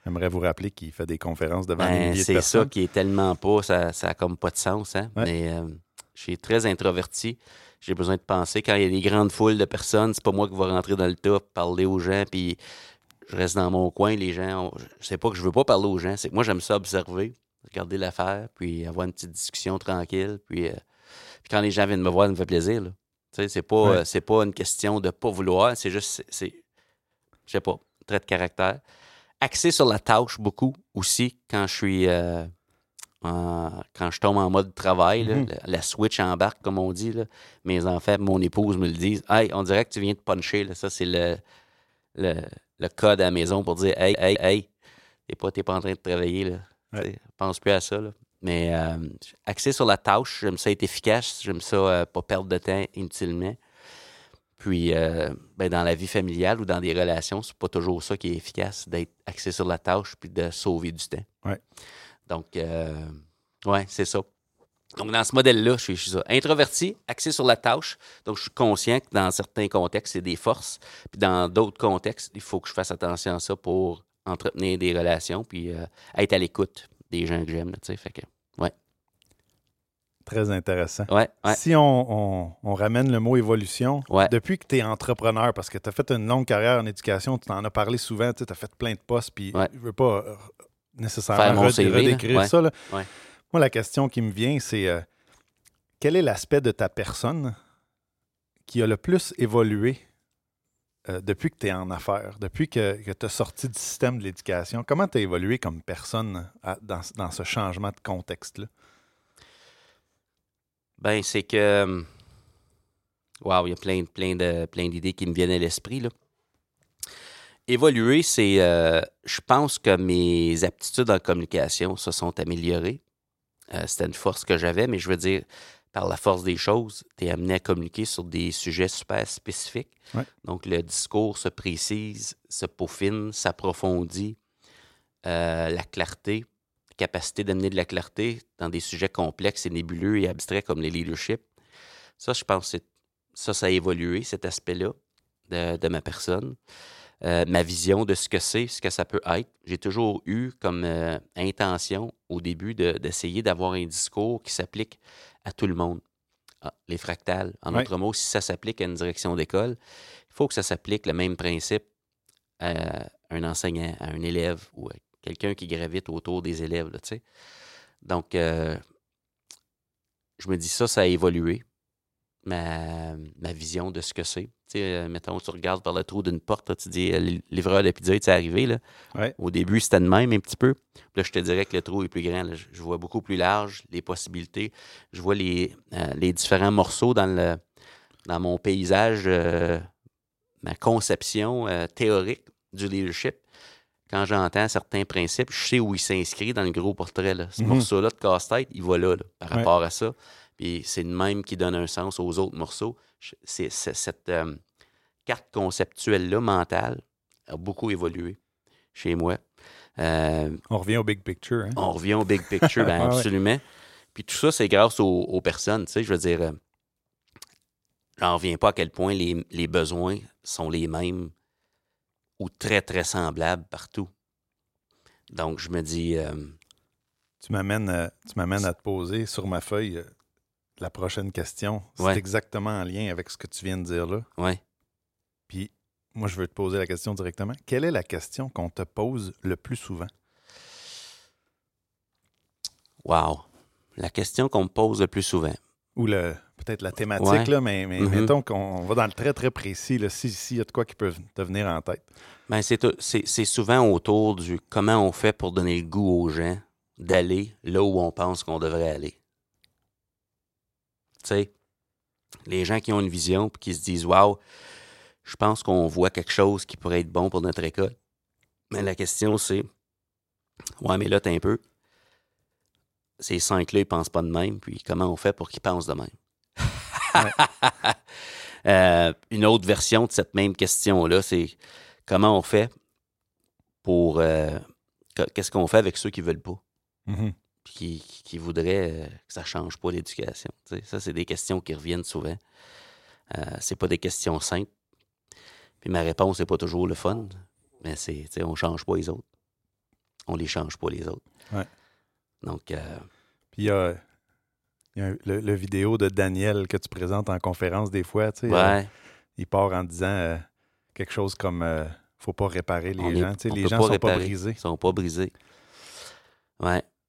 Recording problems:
audio stuttering; at 44 s and at 3:09

